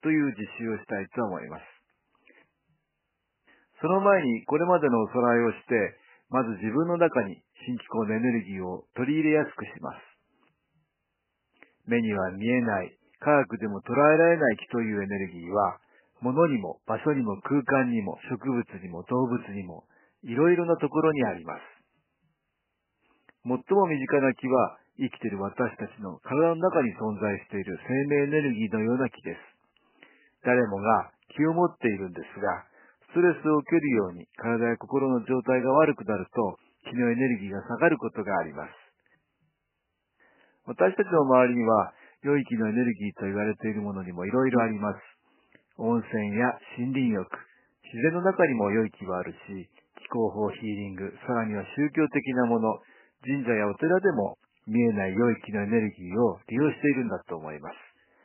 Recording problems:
garbled, watery; badly; nothing above 2.5 kHz
thin; very slightly; fading below 1 kHz

